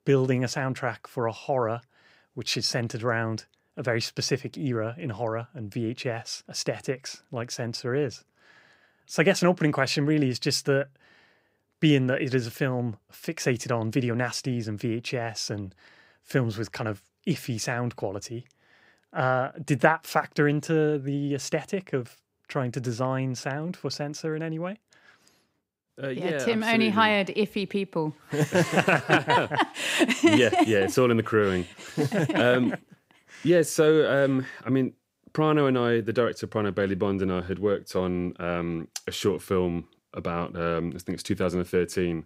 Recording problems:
none

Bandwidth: 15.5 kHz